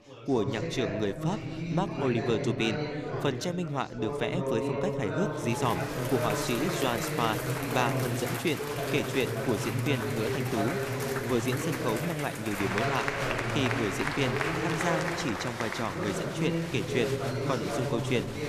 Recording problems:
chatter from many people; very loud; throughout; as loud as the speech

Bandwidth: 14.5 kHz